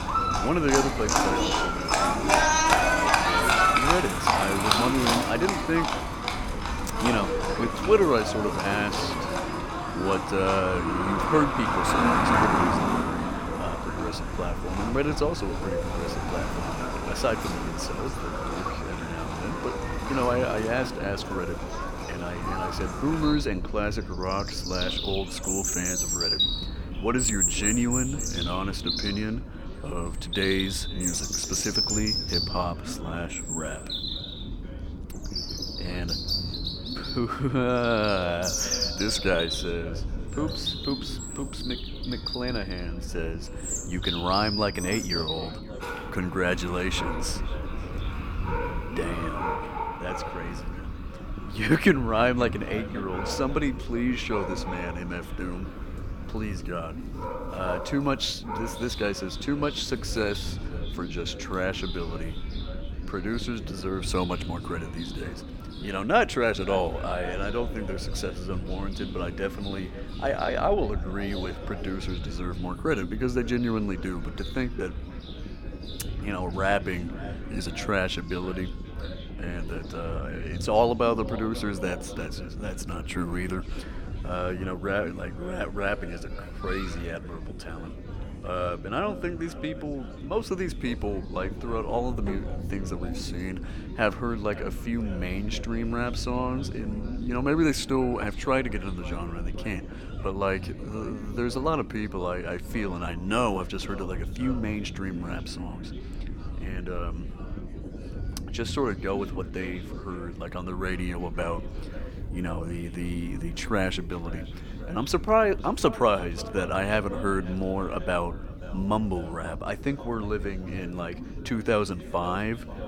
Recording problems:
echo of what is said; noticeable; throughout; 530 ms later, 15 dB below the speech
animal sounds; very loud; throughout; 1 dB above the speech
low rumble; noticeable; throughout; 15 dB below the speech
background chatter; faint; throughout; 4 voices, 25 dB below the speech

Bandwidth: 17.5 kHz